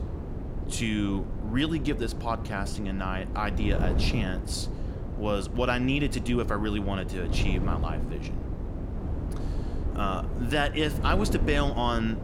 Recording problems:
wind noise on the microphone; occasional gusts; 10 dB below the speech

